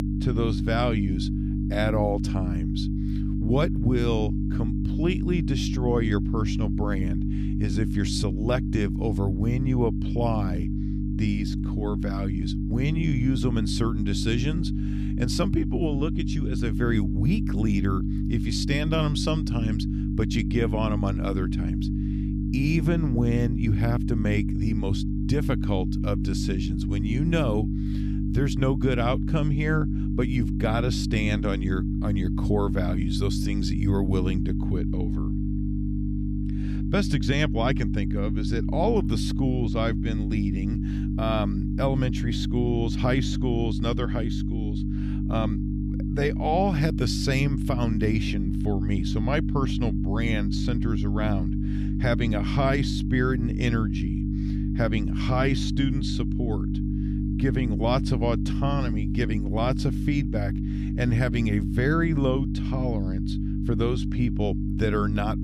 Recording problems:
electrical hum; loud; throughout; 50 Hz, 5 dB below the speech

